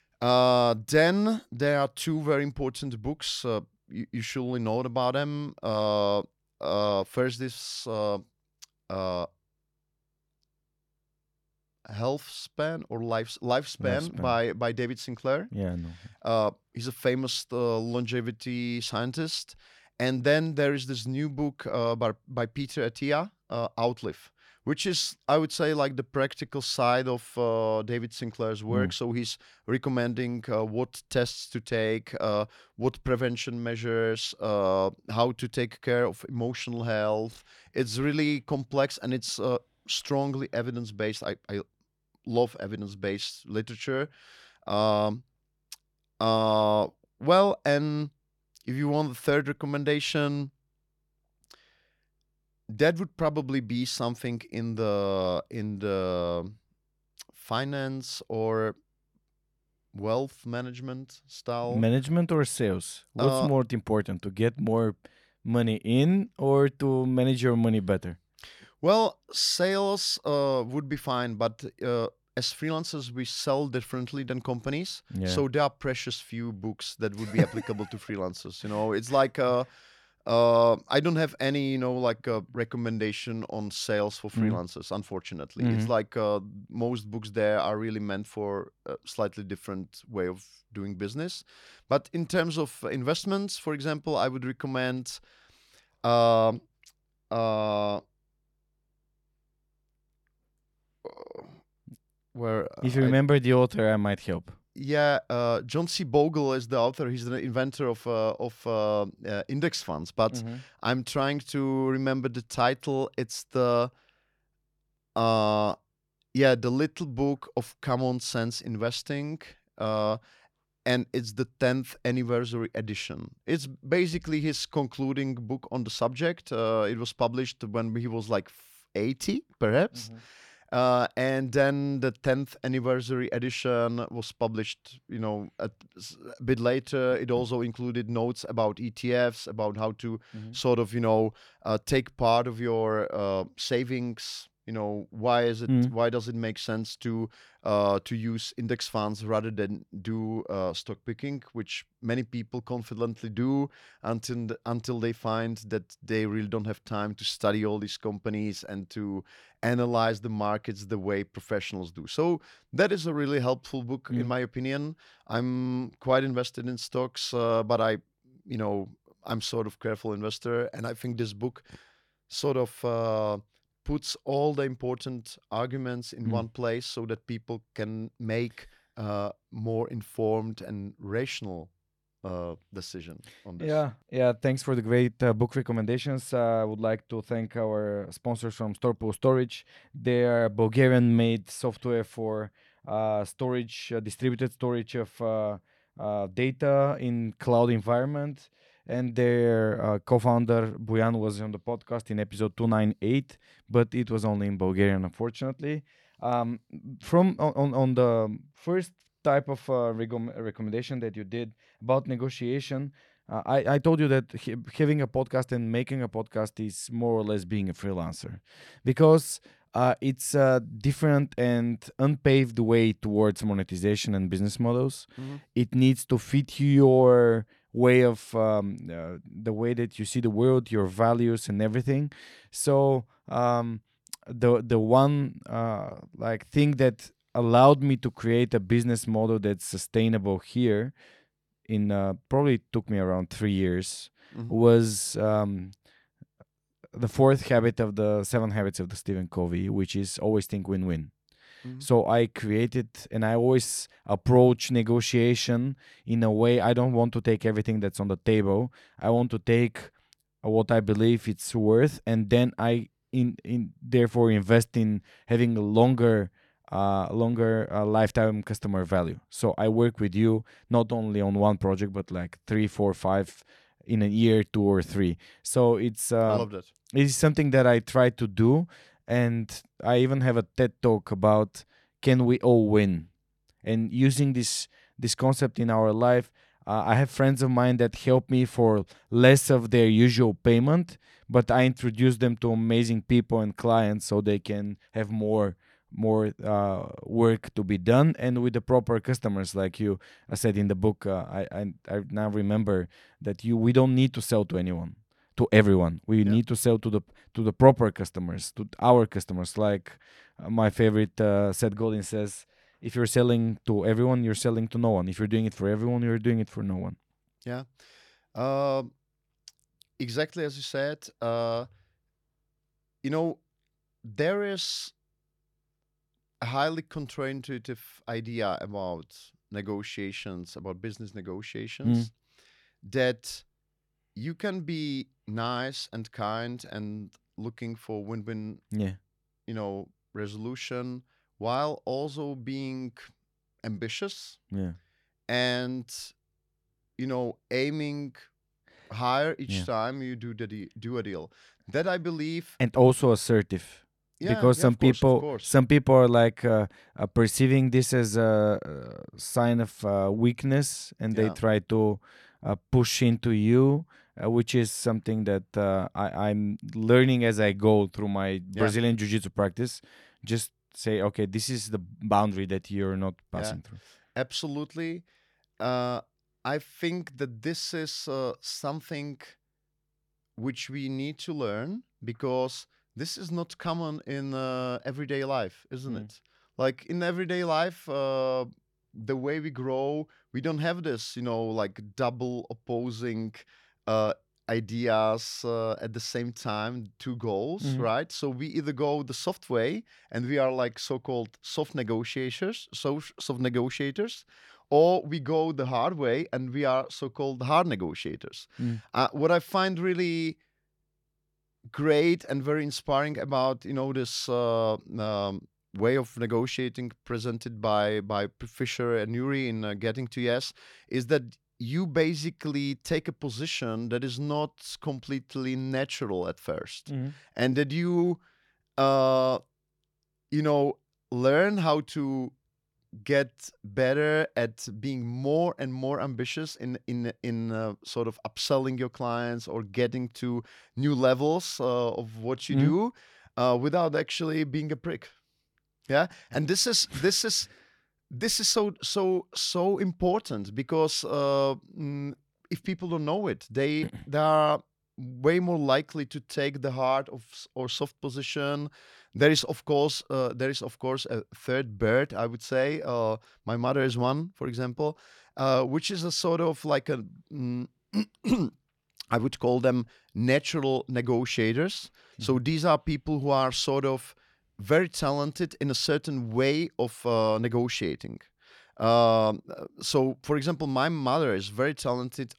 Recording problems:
none

